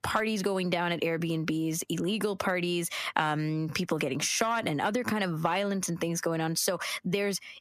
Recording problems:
squashed, flat; heavily

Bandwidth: 14.5 kHz